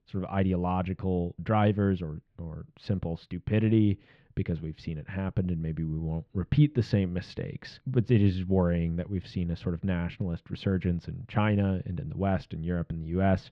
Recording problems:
muffled; slightly; fading above 3.5 kHz

